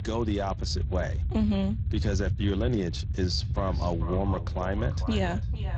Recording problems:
echo of what is said; noticeable; from 3.5 s on; 450 ms later, 15 dB below the speech
garbled, watery; slightly; nothing above 7.5 kHz
low rumble; noticeable; throughout; 15 dB below the speech

